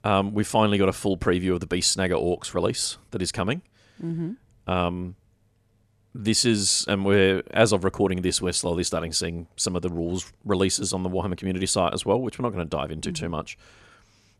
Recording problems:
none

